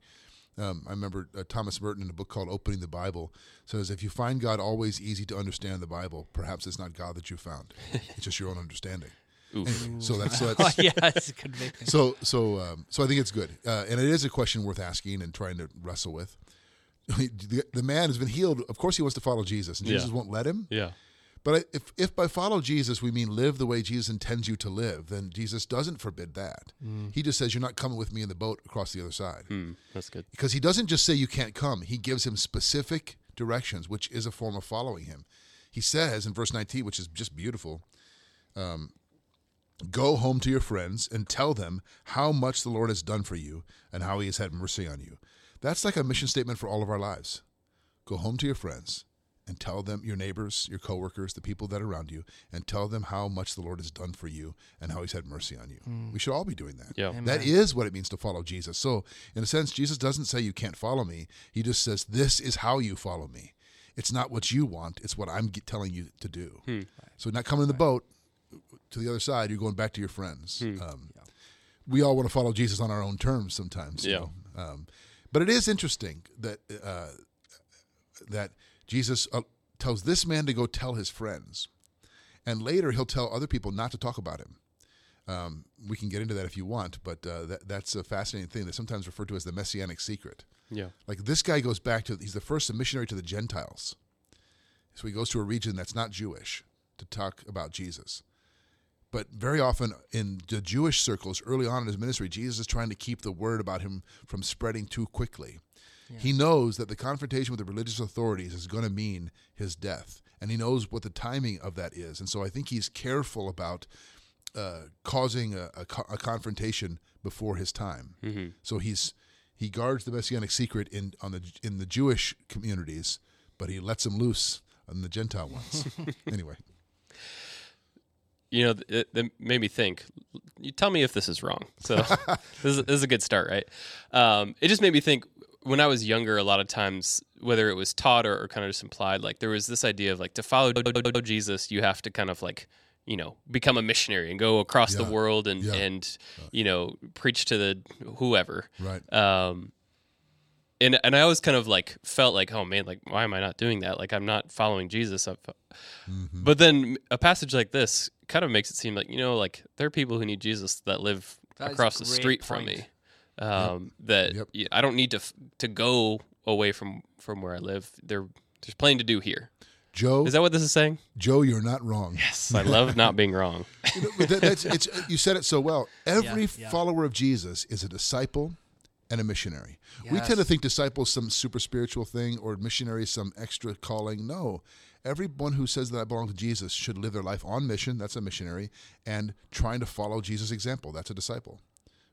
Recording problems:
audio stuttering; at 2:21

